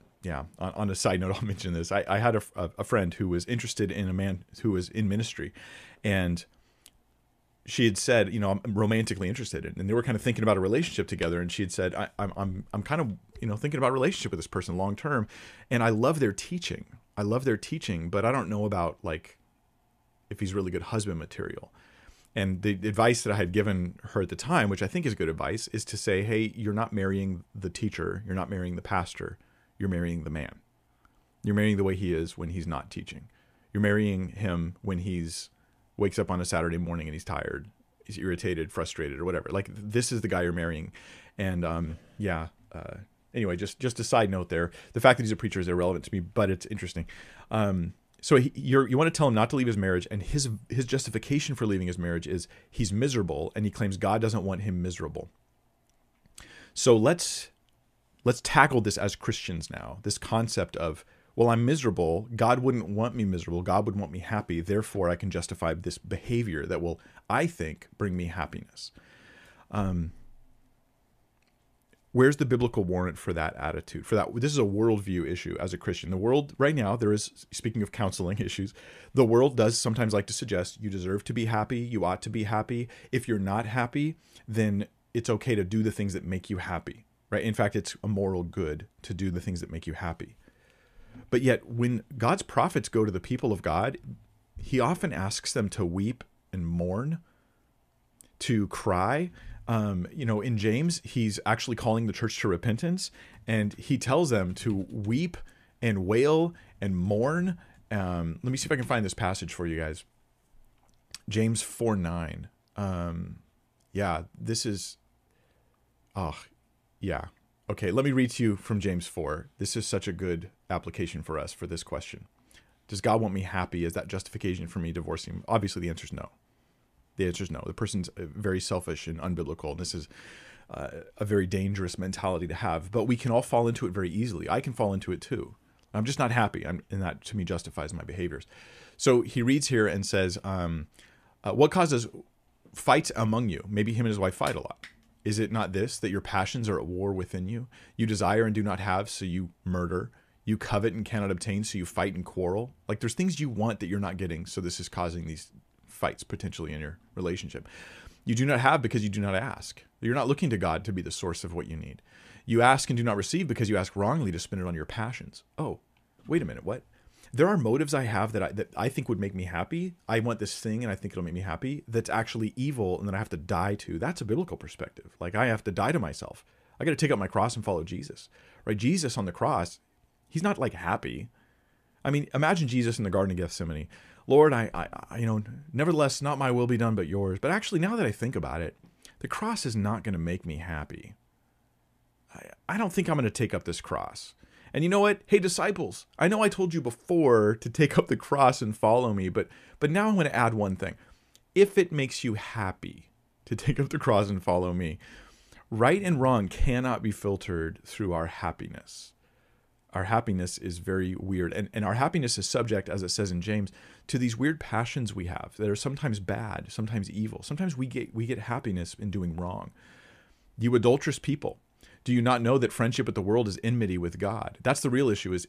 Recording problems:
none

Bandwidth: 14.5 kHz